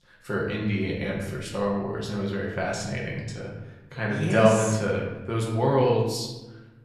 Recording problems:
off-mic speech; far
room echo; noticeable; dies away in 1 s

